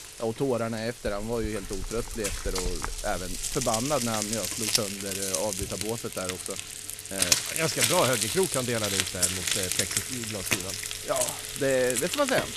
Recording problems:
household noises; very loud; throughout; 3 dB above the speech

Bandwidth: 14.5 kHz